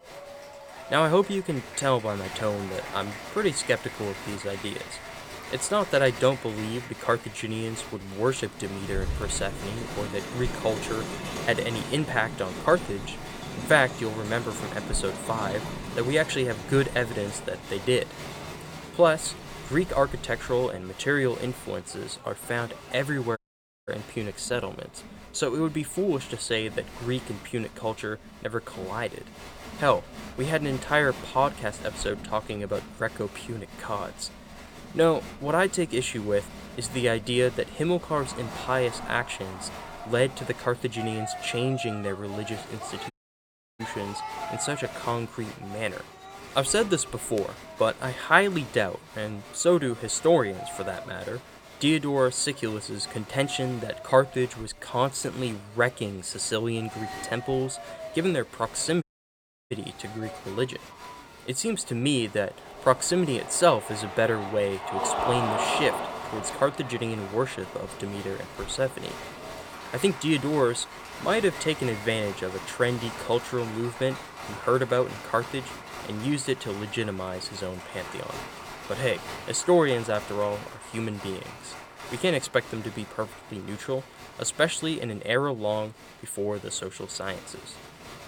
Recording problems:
crowd noise; noticeable; throughout; 10 dB below the speech
audio cutting out; at 23 s for 0.5 s, at 43 s for 0.5 s and at 59 s for 0.5 s

